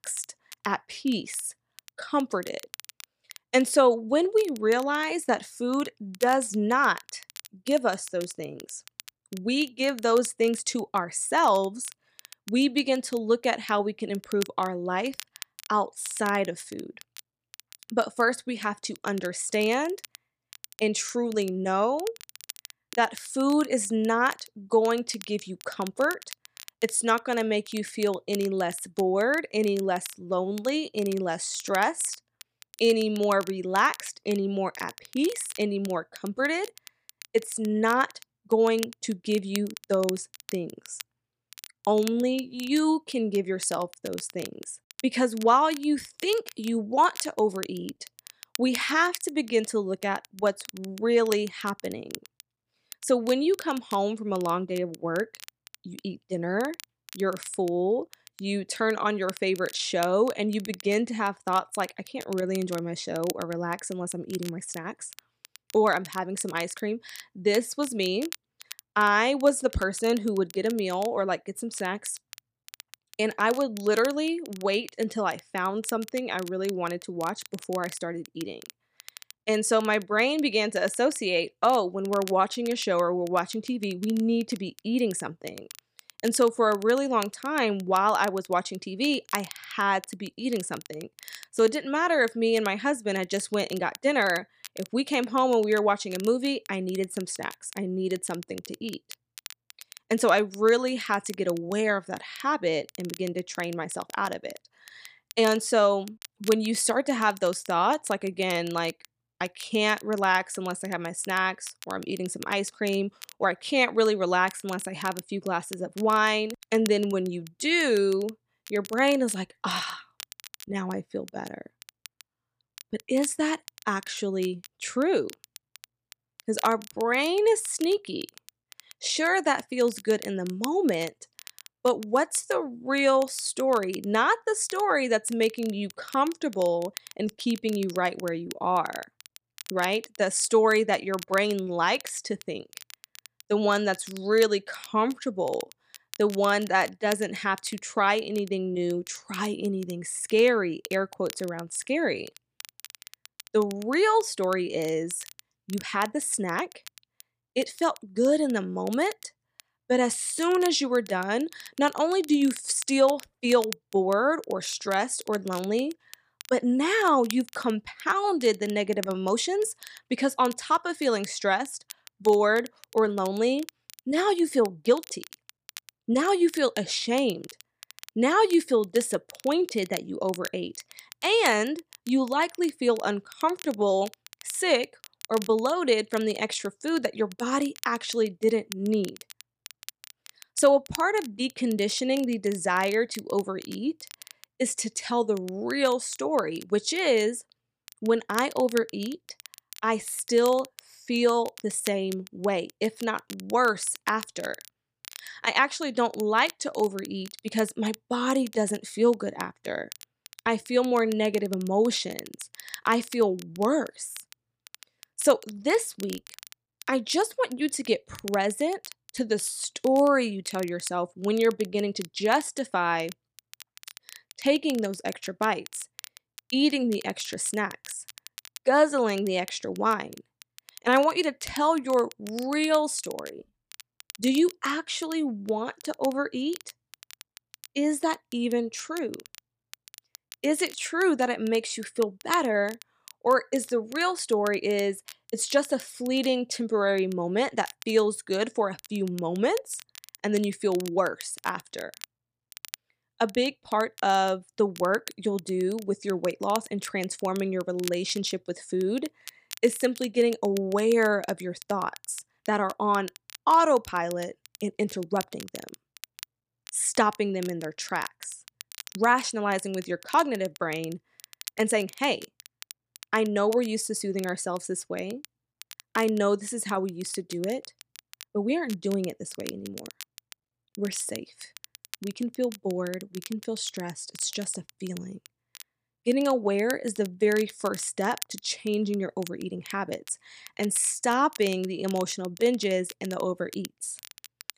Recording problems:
crackle, like an old record; noticeable; 20 dB below the speech

